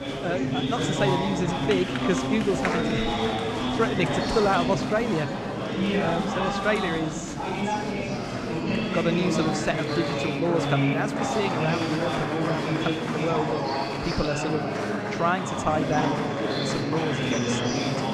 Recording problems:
murmuring crowd; very loud; throughout; 2 dB above the speech

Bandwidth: 14.5 kHz